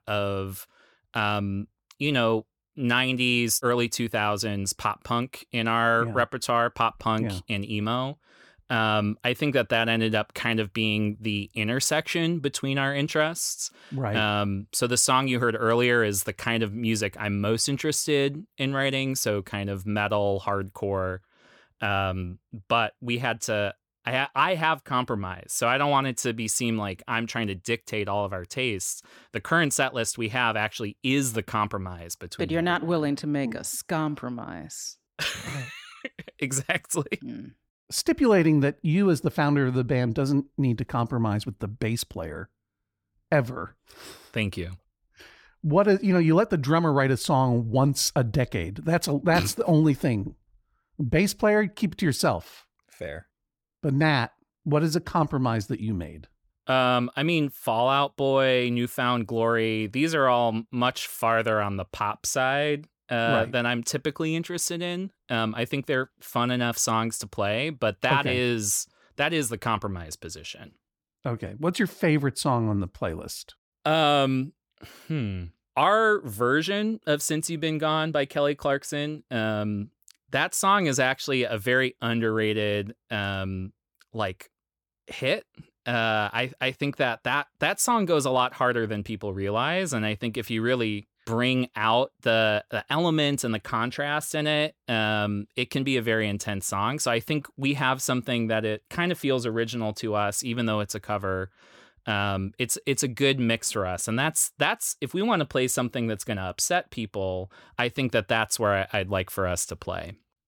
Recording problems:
none

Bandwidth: 18.5 kHz